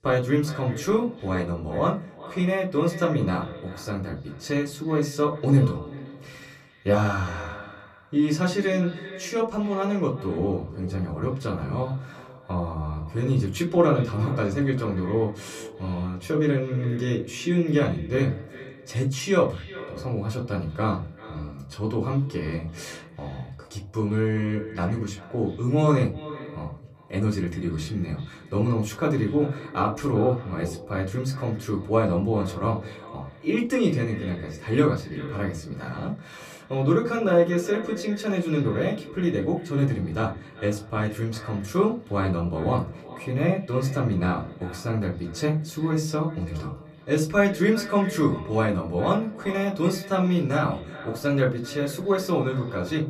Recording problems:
echo of what is said; noticeable; throughout; 390 ms later, 15 dB below the speech
room echo; very slight; dies away in 0.3 s
off-mic speech; somewhat distant

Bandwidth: 14.5 kHz